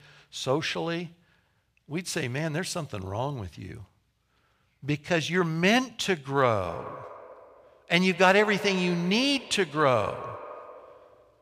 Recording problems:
echo of what is said; noticeable; from 6.5 s on; 200 ms later, 15 dB below the speech

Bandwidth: 15 kHz